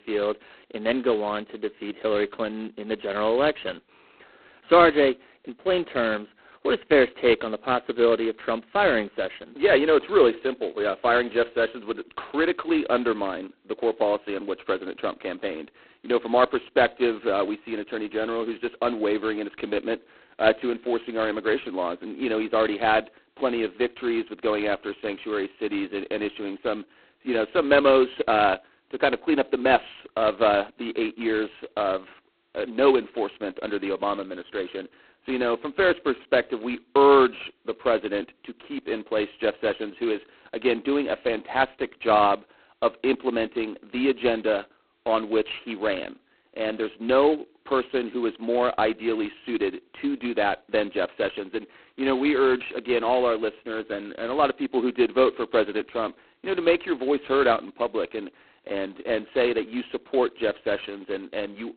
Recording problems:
phone-call audio; poor line; nothing above 4 kHz

